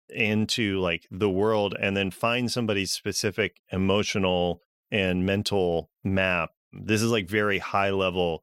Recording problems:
none

